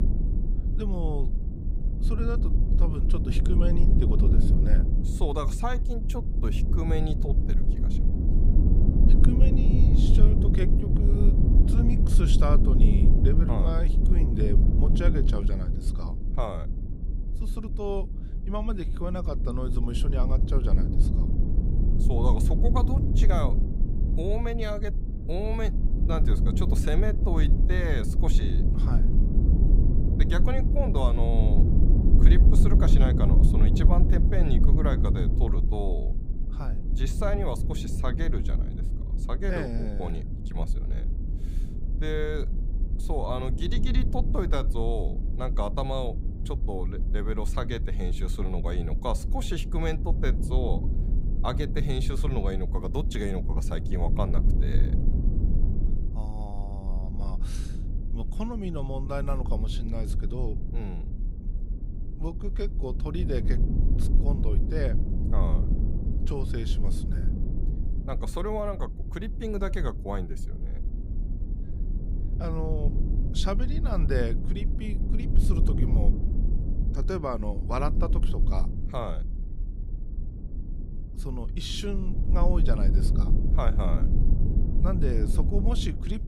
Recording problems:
low rumble; loud; throughout; 5 dB below the speech

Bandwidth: 15.5 kHz